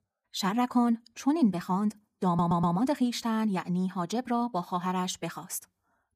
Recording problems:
wrong speed, natural pitch; too fast; 1.5 times normal speed
audio stuttering; at 2.5 s

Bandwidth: 14.5 kHz